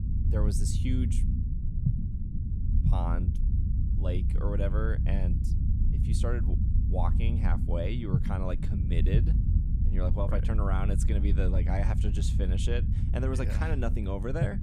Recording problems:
low rumble; loud; throughout; 6 dB below the speech

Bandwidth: 15 kHz